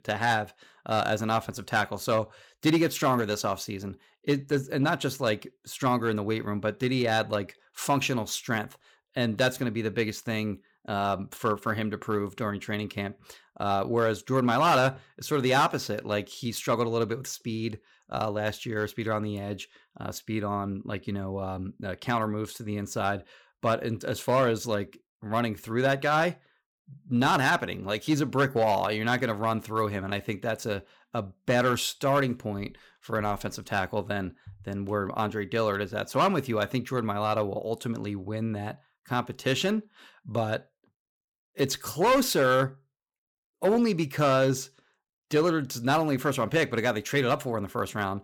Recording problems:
none

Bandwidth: 18.5 kHz